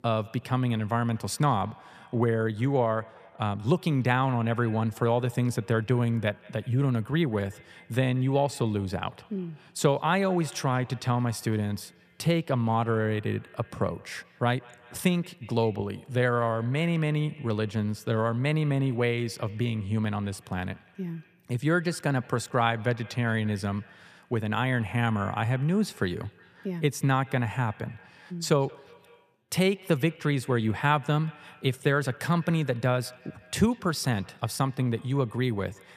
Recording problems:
echo of what is said; faint; throughout; 180 ms later, 25 dB below the speech

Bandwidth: 14.5 kHz